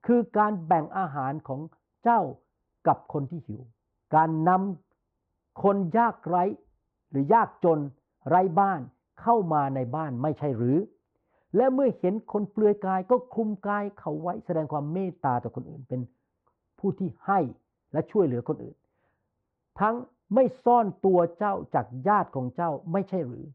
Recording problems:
muffled; very; fading above 3 kHz

